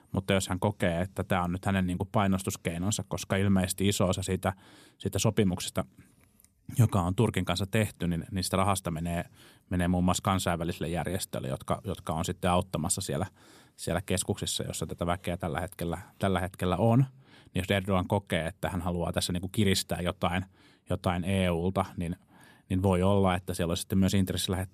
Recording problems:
none

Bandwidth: 14.5 kHz